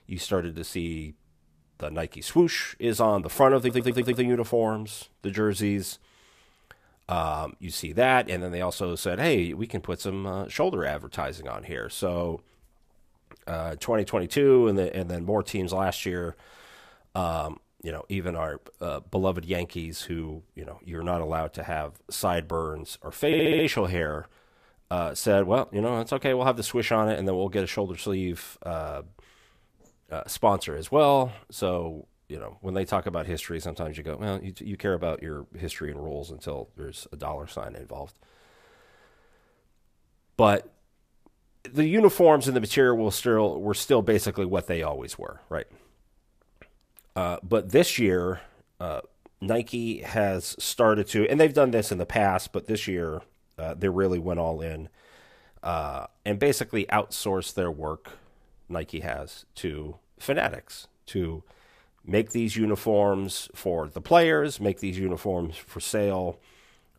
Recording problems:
audio stuttering; at 3.5 s and at 23 s

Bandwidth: 14.5 kHz